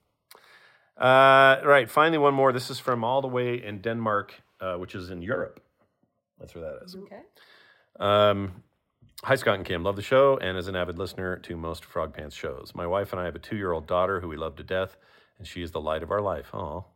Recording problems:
muffled; slightly; fading above 4 kHz

